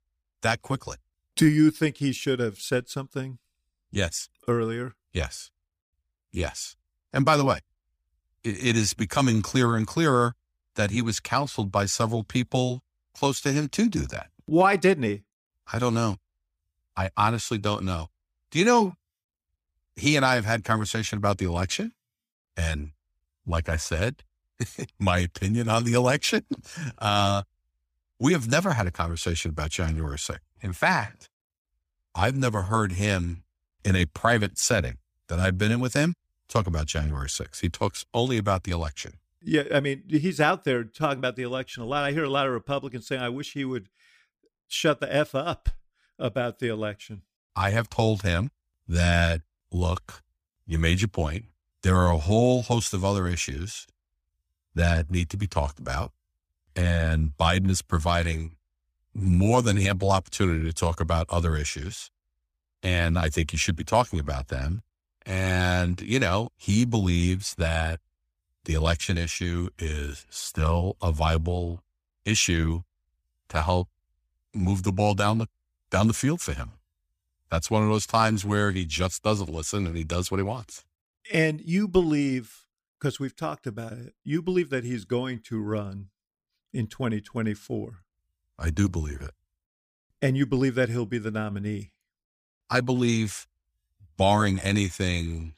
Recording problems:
none

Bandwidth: 15 kHz